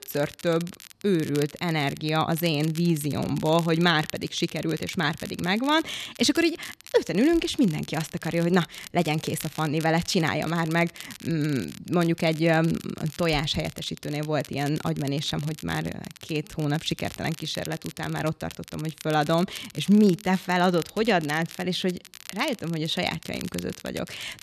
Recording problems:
crackle, like an old record; noticeable; 15 dB below the speech

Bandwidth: 13.5 kHz